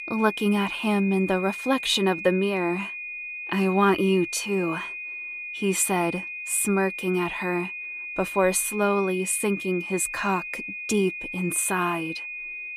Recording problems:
high-pitched whine; loud; throughout; 2.5 kHz, 8 dB below the speech

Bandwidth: 14.5 kHz